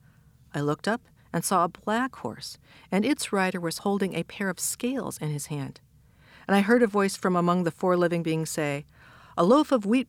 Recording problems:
none

